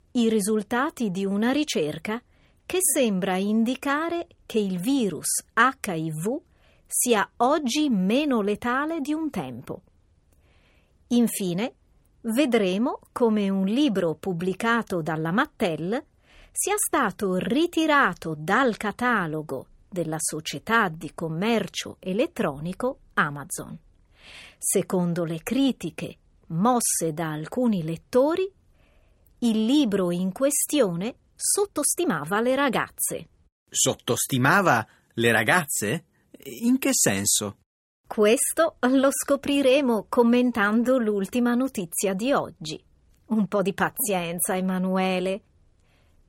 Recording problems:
uneven, jittery; strongly; from 4.5 to 44 s

